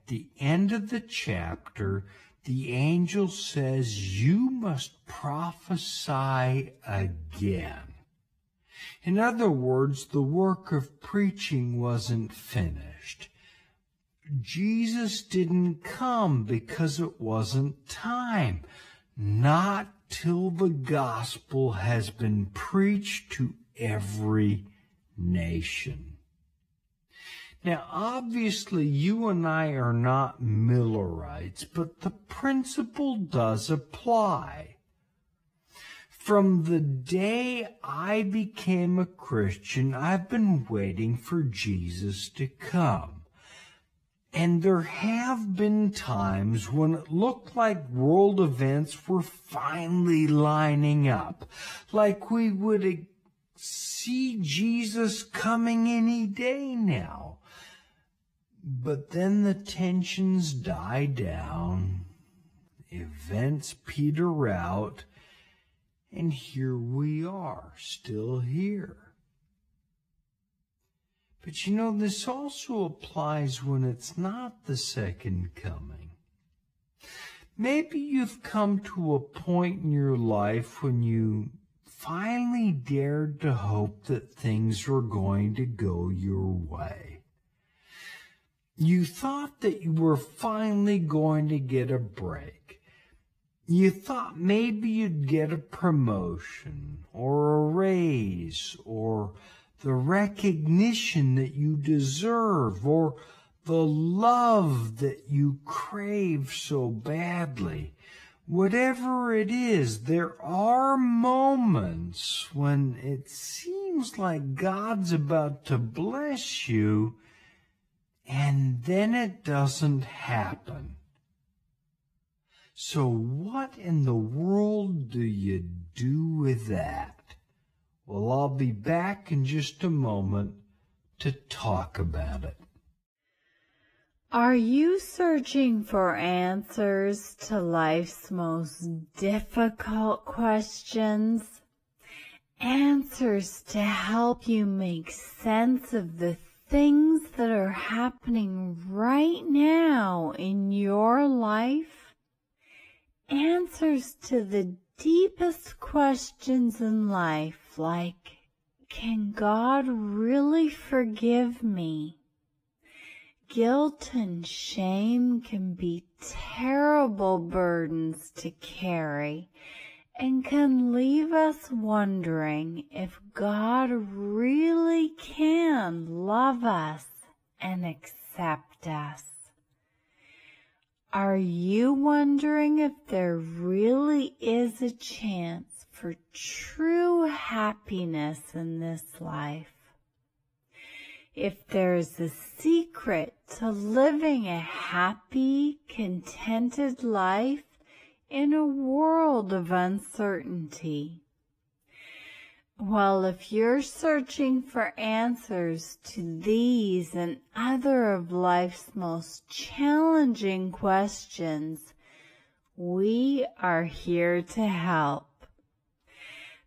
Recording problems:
wrong speed, natural pitch; too slow; 0.5 times normal speed
garbled, watery; slightly; nothing above 15 kHz

